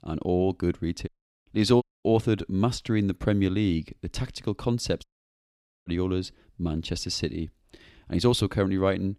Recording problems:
audio cutting out; at 1 s, at 2 s and at 5 s for 1 s

